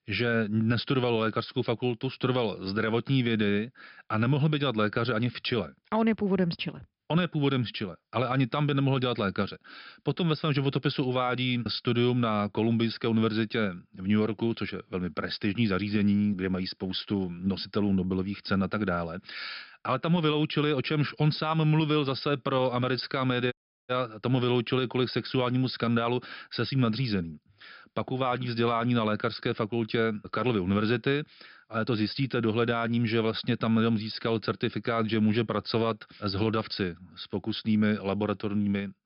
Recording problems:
high frequencies cut off; noticeable; nothing above 5.5 kHz
audio cutting out; at 24 s

